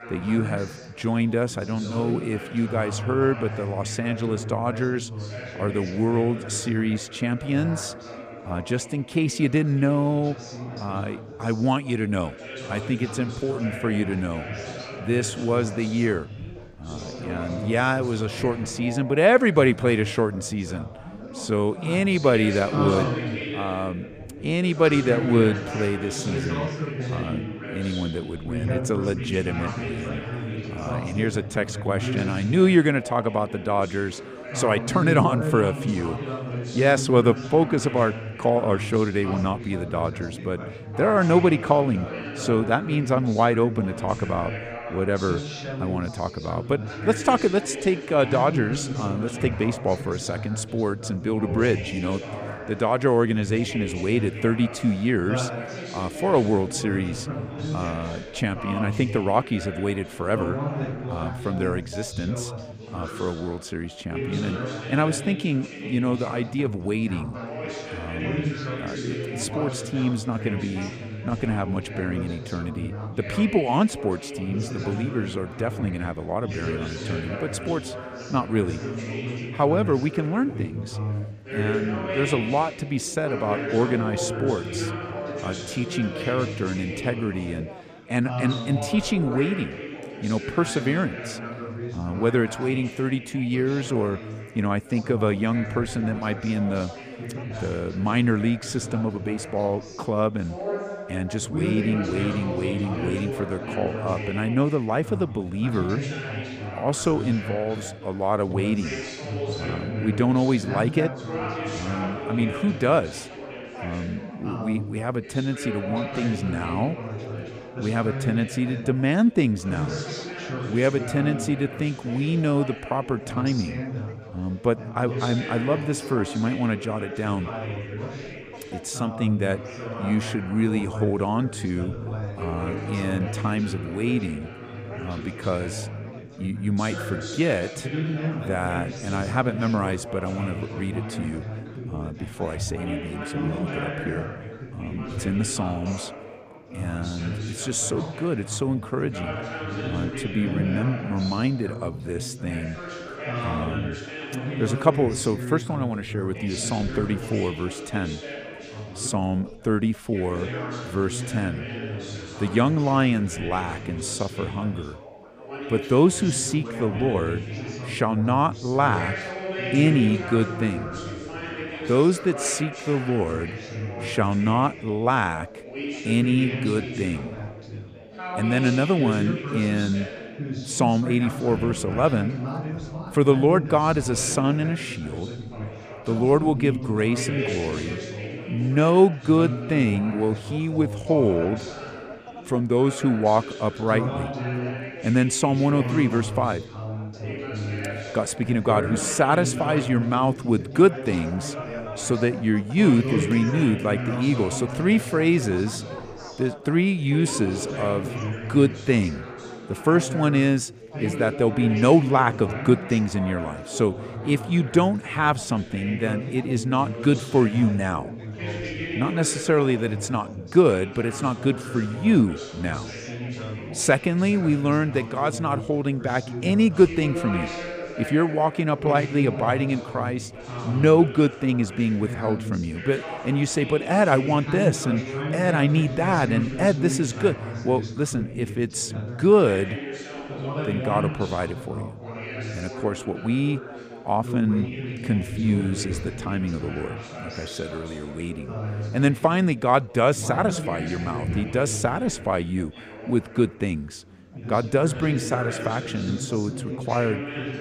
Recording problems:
background chatter; loud; throughout; 4 voices, 8 dB below the speech

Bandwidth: 15 kHz